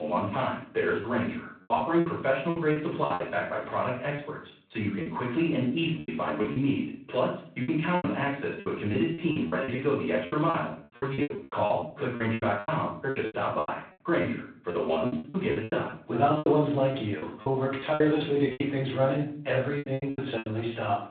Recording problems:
off-mic speech; far
room echo; noticeable; dies away in 0.4 s
phone-call audio; nothing above 3.5 kHz
choppy; very; 15% of the speech affected
abrupt cut into speech; at the start

